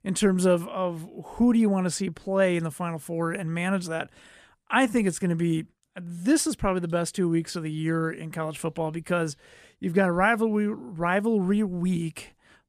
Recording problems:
none

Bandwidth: 14.5 kHz